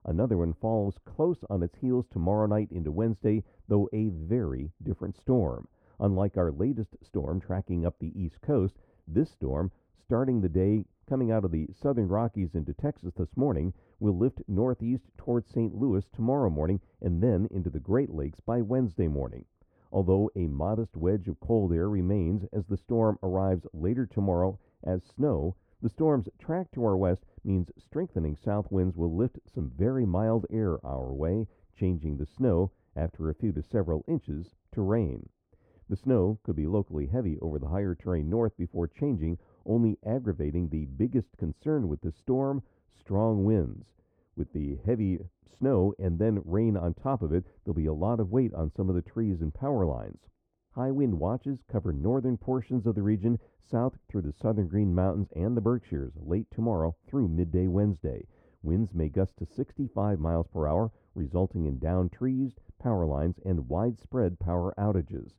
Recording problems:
muffled; very; fading above 1.5 kHz

